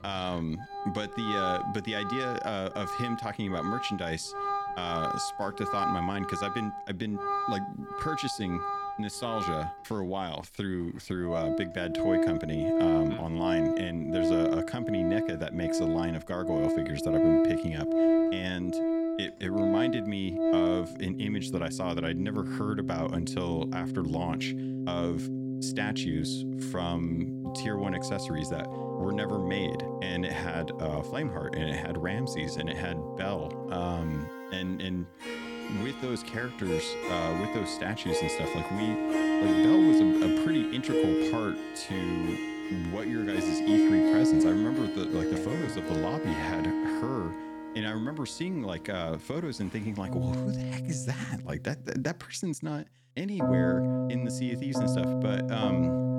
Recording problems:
background music; very loud; throughout; 4 dB above the speech

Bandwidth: 18.5 kHz